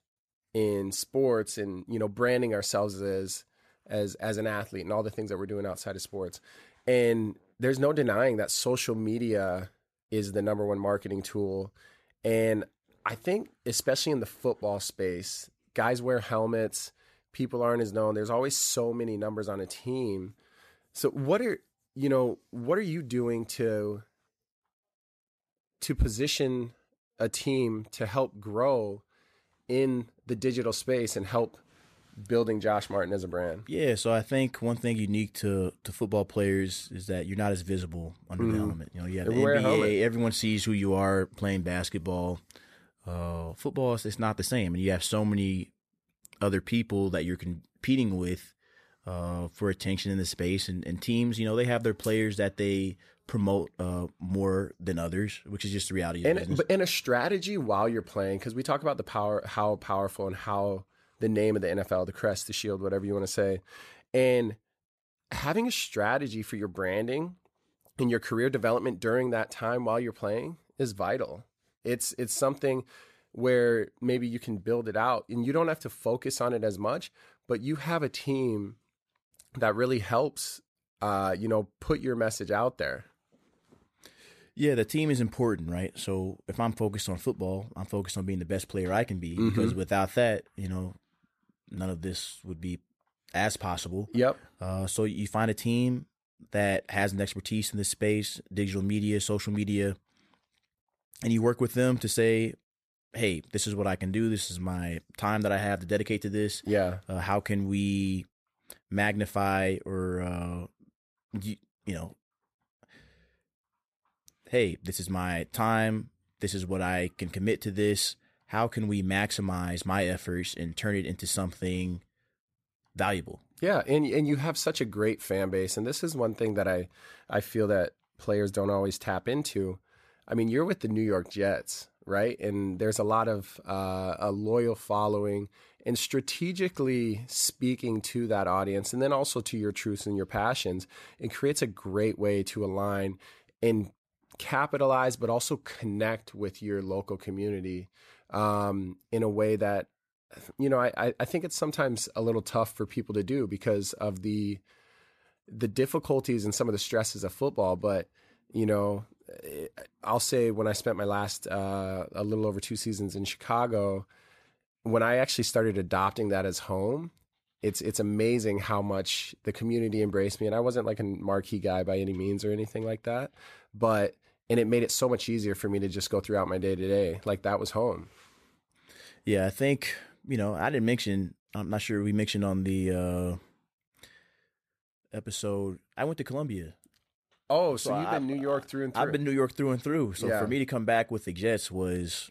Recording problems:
none

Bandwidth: 14.5 kHz